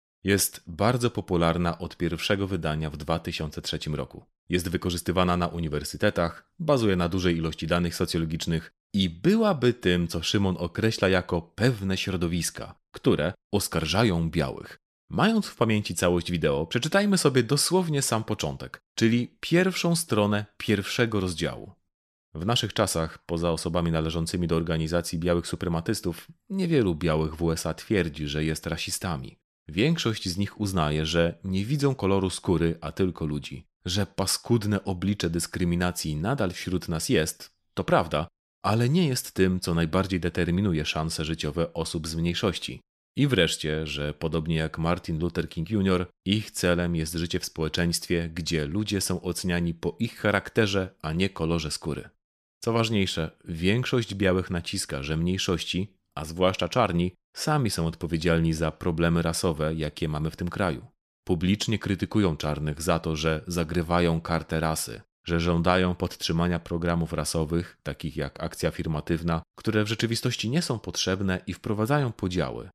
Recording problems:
none

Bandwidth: 13.5 kHz